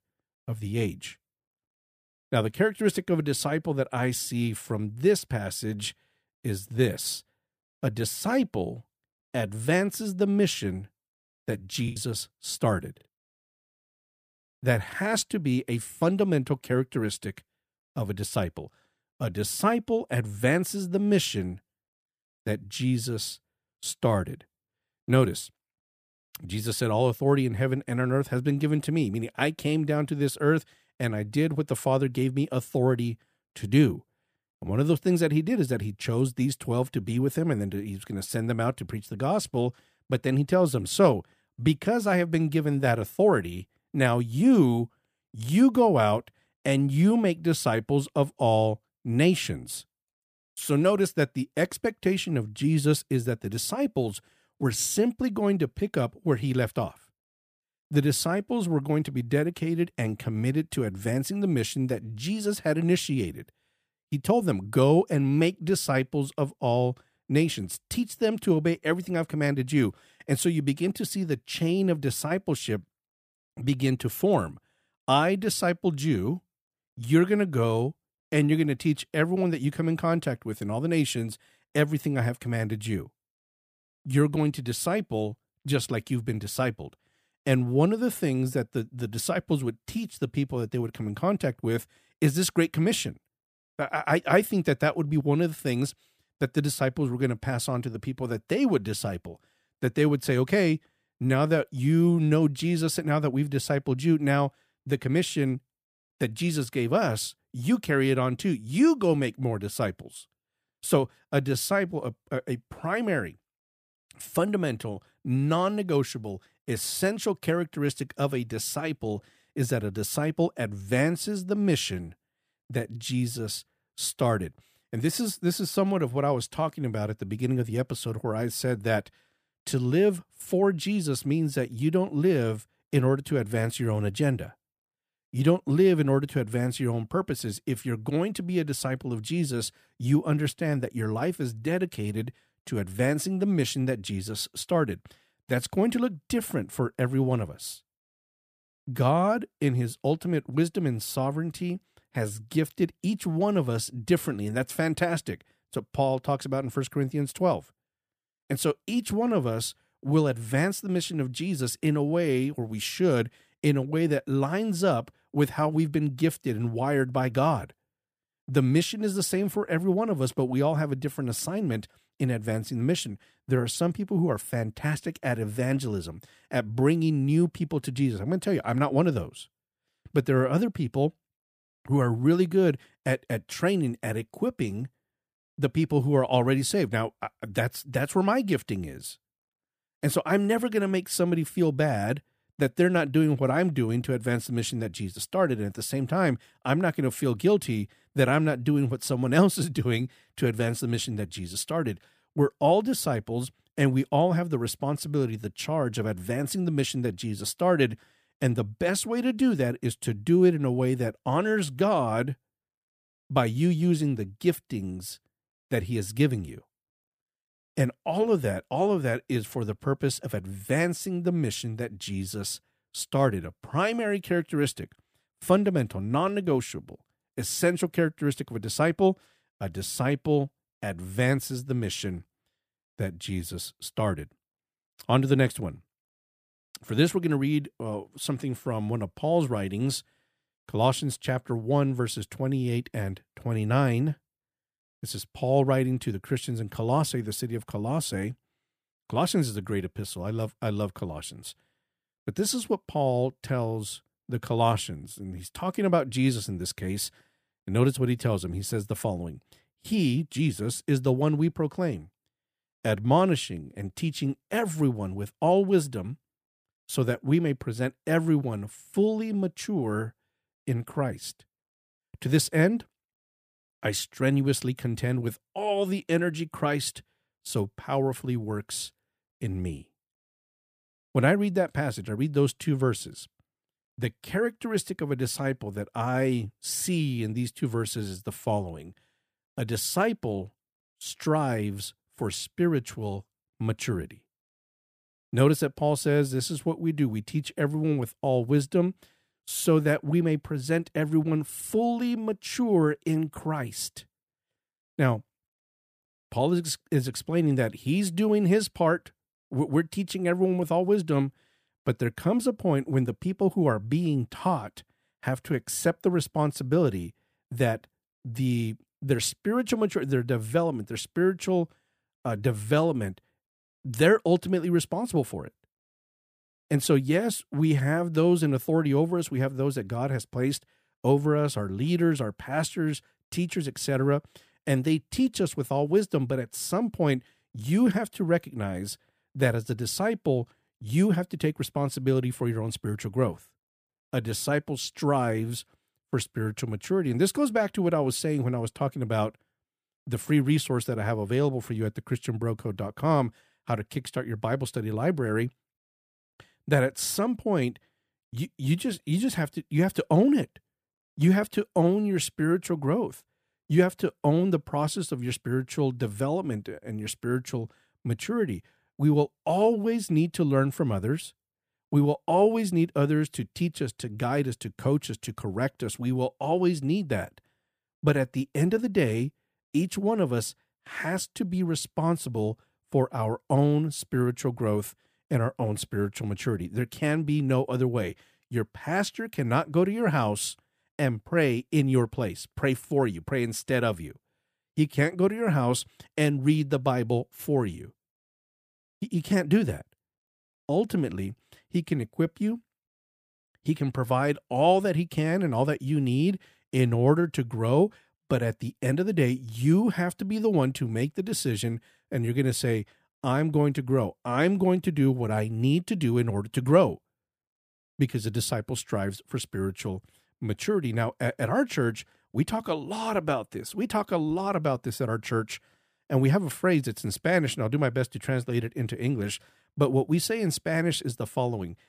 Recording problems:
choppy; occasionally; at 12 s; 2% of the speech affected

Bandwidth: 15 kHz